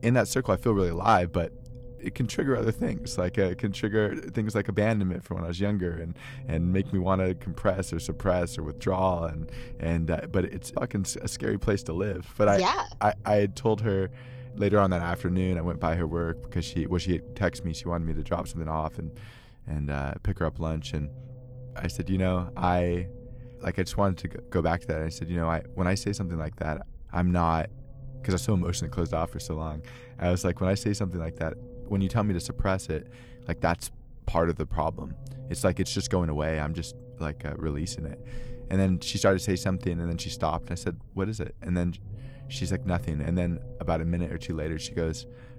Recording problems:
low rumble; noticeable; throughout; 20 dB below the speech

